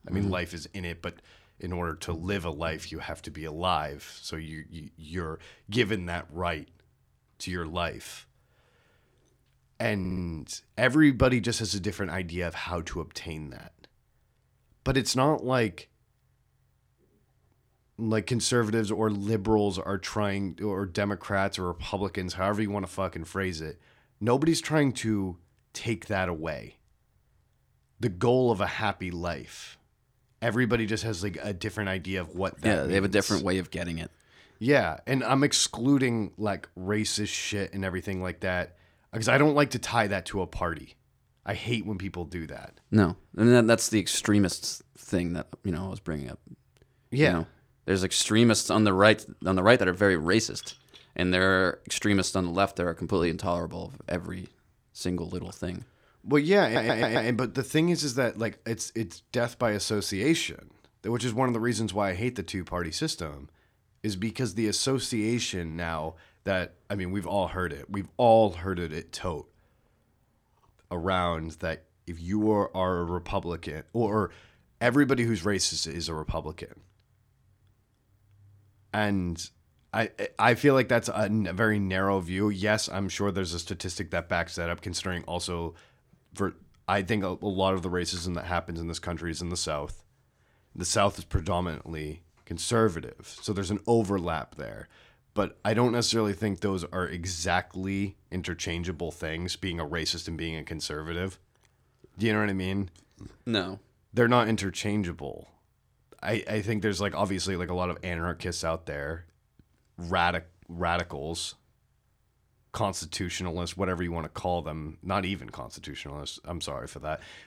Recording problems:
audio stuttering; at 10 s and at 57 s

